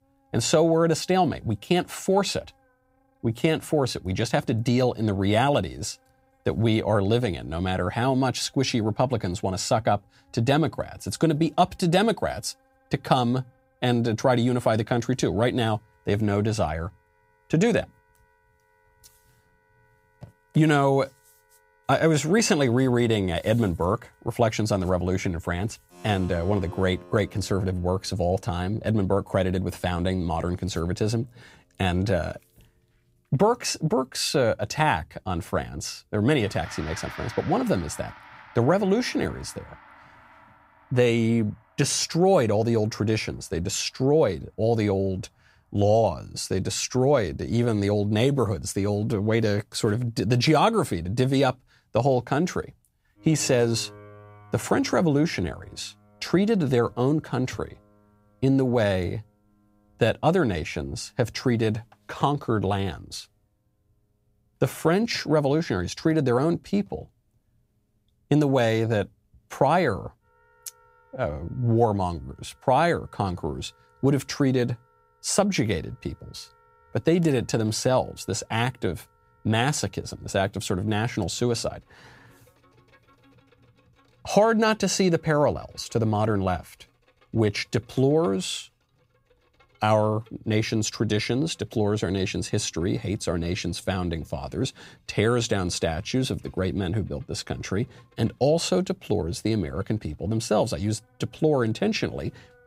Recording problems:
background music; faint; throughout; 25 dB below the speech

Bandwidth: 15.5 kHz